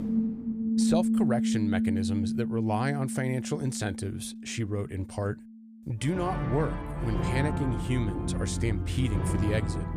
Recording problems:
background music; very loud; throughout; 1 dB above the speech

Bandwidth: 15 kHz